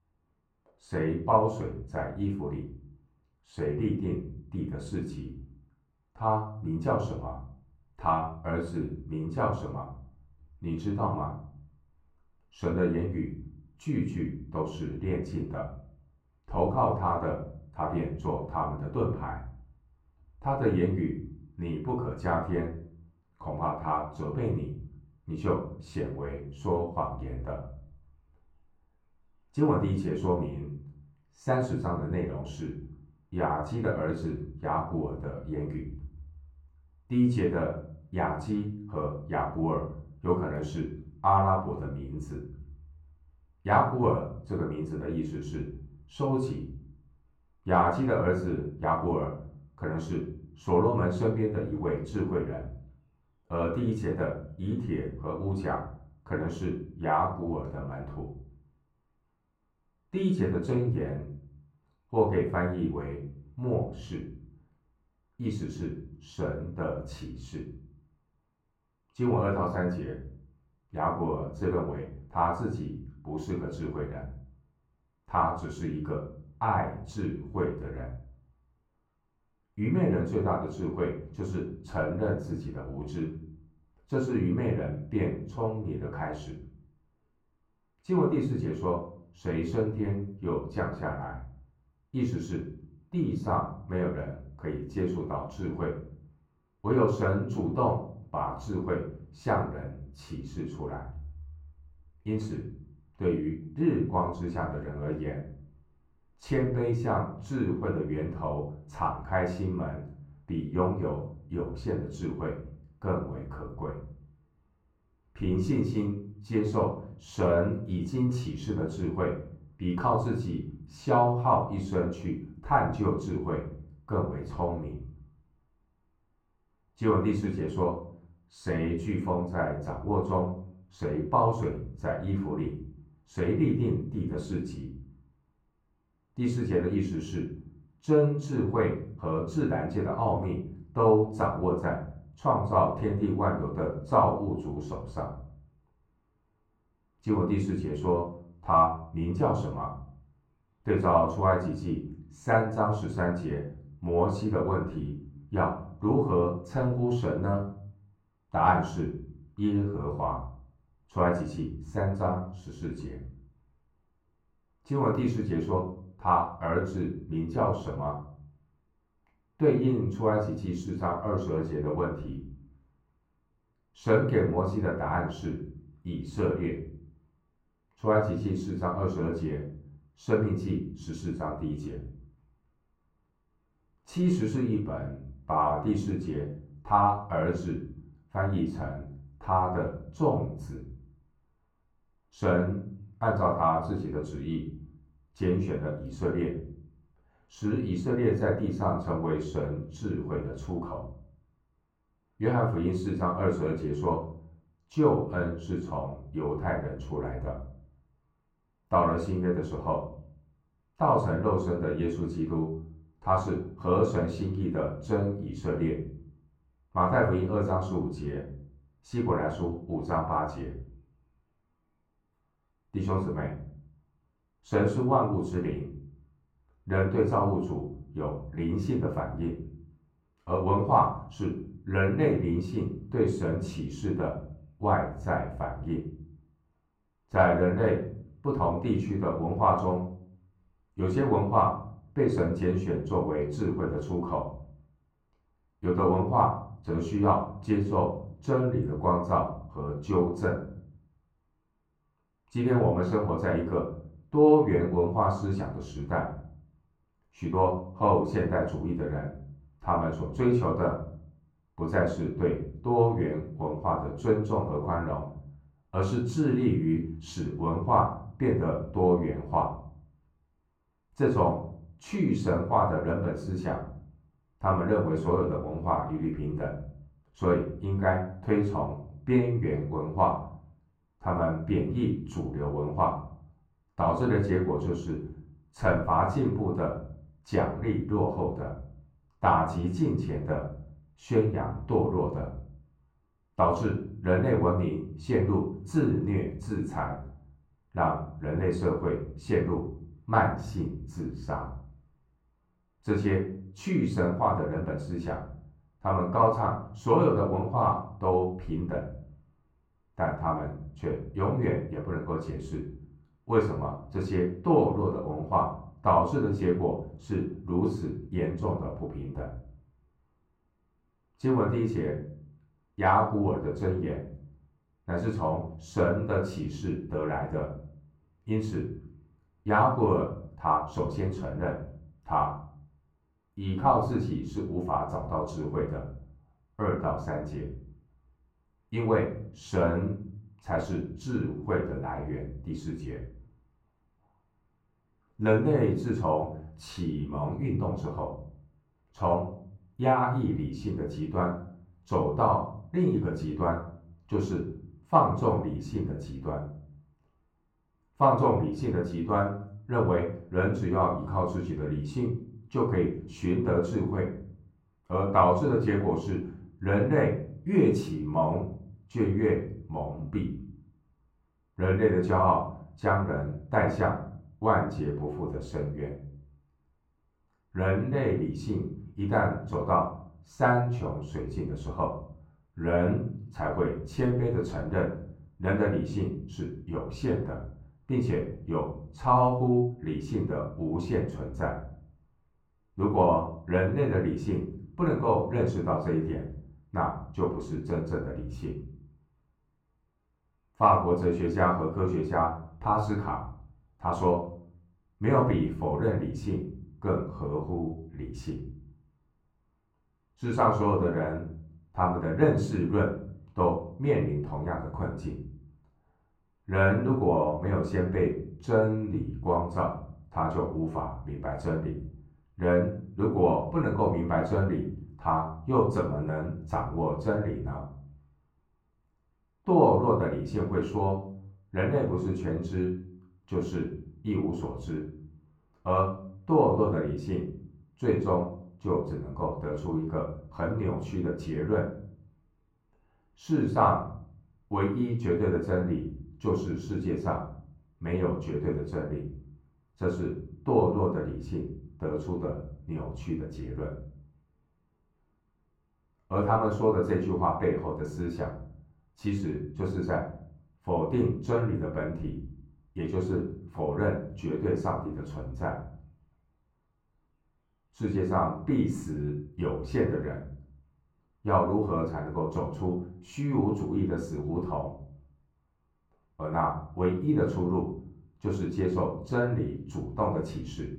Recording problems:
off-mic speech; far
muffled; very; fading above 3.5 kHz
room echo; slight; dies away in 0.5 s

